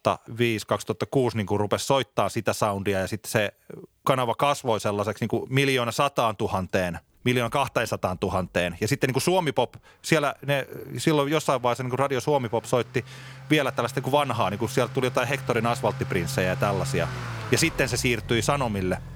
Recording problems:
traffic noise; noticeable; throughout; 10 dB below the speech

